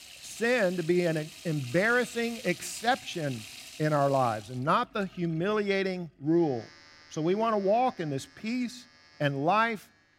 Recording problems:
household noises; noticeable; throughout; 15 dB below the speech

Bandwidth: 16 kHz